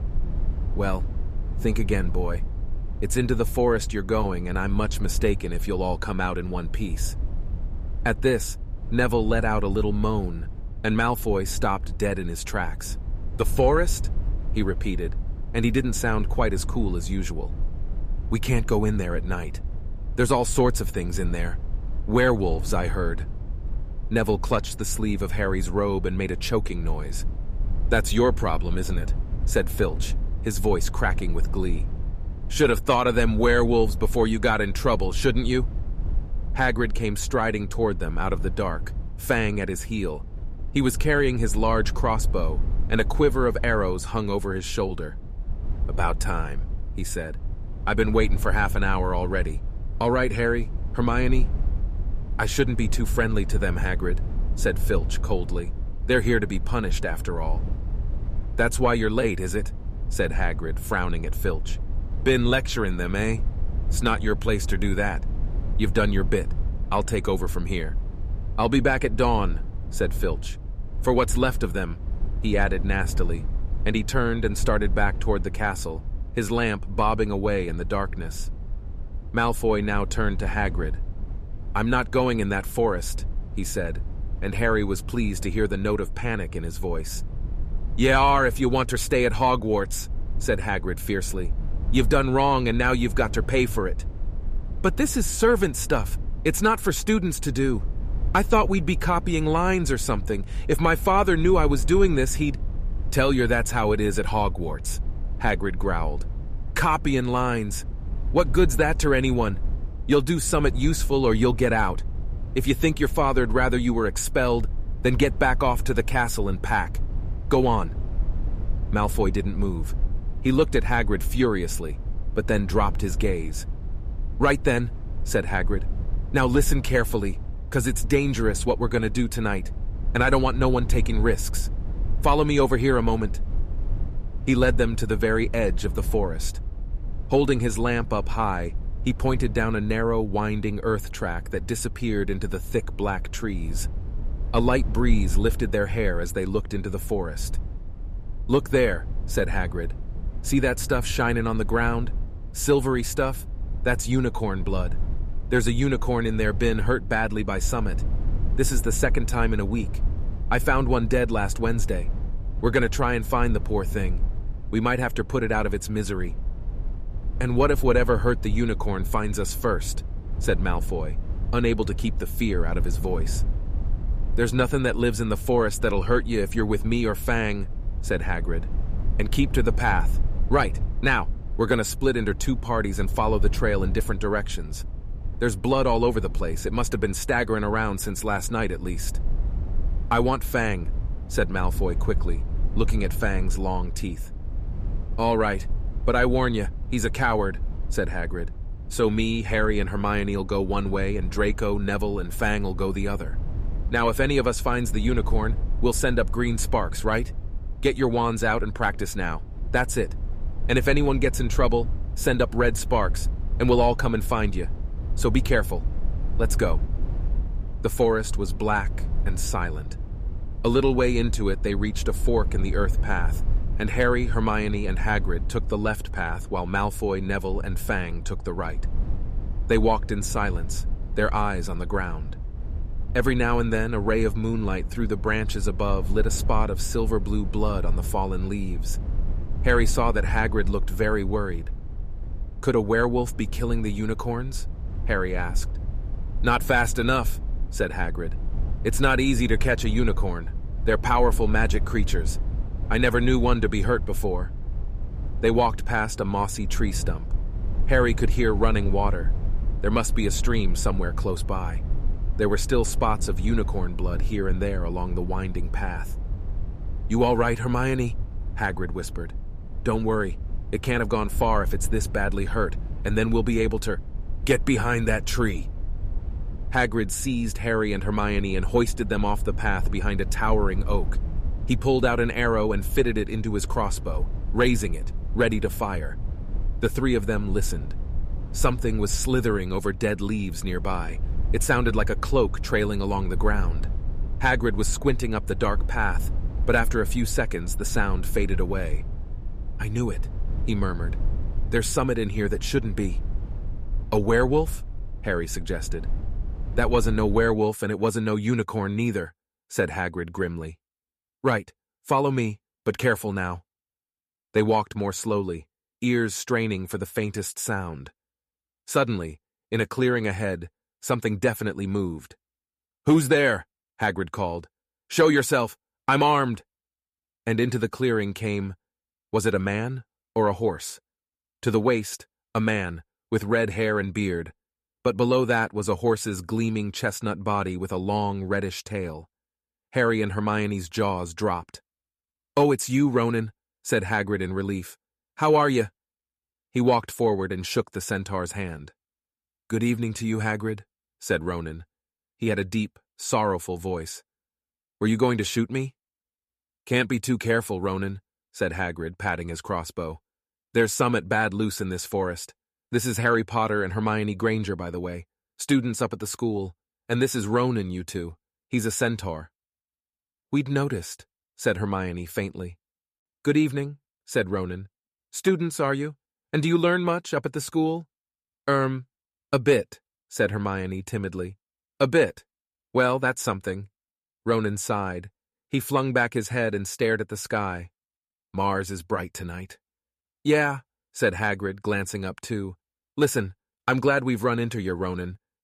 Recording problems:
low rumble; faint; until 5:07; 20 dB below the speech

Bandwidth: 14.5 kHz